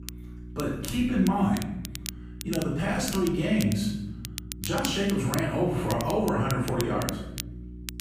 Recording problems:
off-mic speech; far
room echo; noticeable; dies away in 0.9 s
crackle, like an old record; noticeable; 10 dB below the speech
electrical hum; faint; throughout; 60 Hz, 20 dB below the speech

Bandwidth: 15 kHz